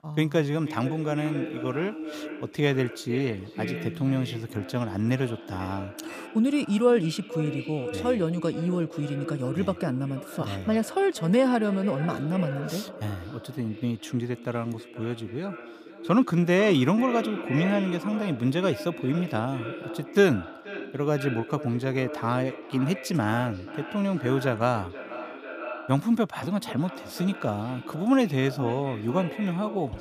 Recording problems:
echo of what is said; strong; throughout; 480 ms later, 10 dB below the speech

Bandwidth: 15 kHz